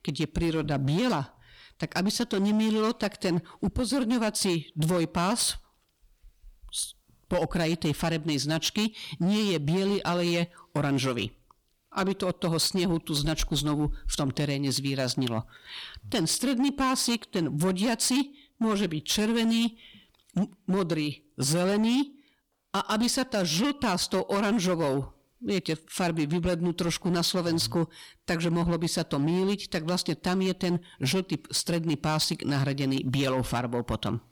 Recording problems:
distortion; slight; 12% of the sound clipped

